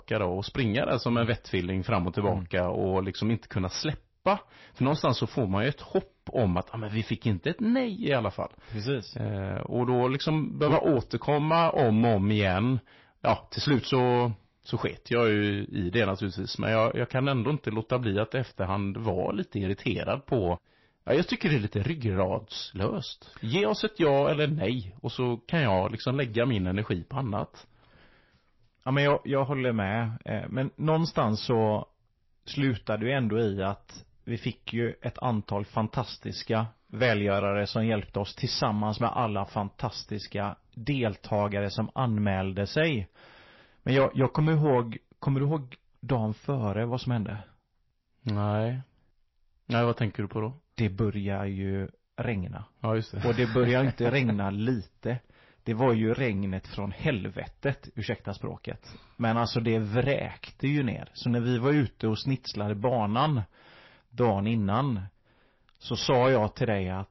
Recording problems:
distortion; slight; 10 dB below the speech
garbled, watery; slightly; nothing above 5.5 kHz

